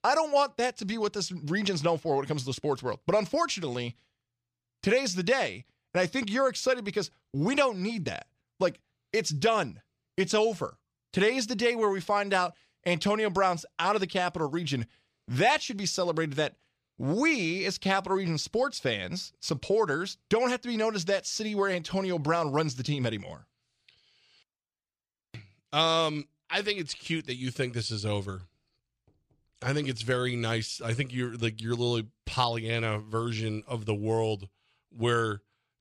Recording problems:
none

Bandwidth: 14.5 kHz